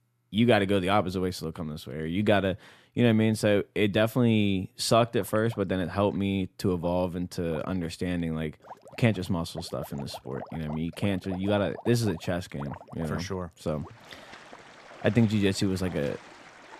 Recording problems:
rain or running water; noticeable; from 5 s on; 20 dB below the speech

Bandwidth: 14.5 kHz